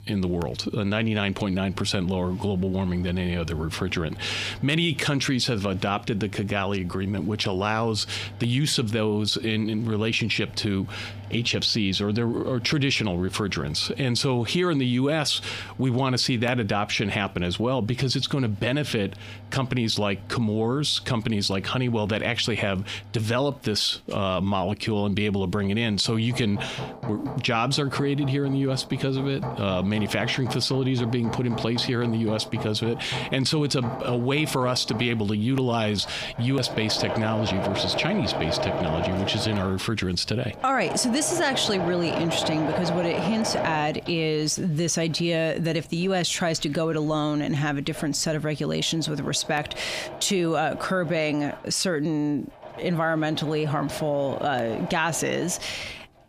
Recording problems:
squashed, flat; heavily, background pumping
machinery noise; noticeable; throughout; 10 dB below the speech

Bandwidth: 15 kHz